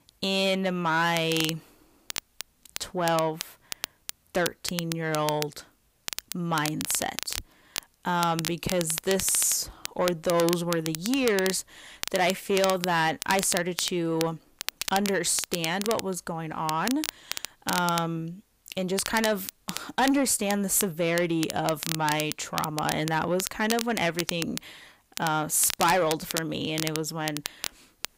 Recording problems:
distortion; slight; 10 dB below the speech
crackle, like an old record; loud; 8 dB below the speech

